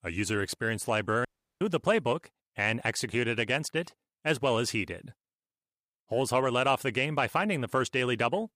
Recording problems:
audio cutting out; at 1.5 s

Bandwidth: 15 kHz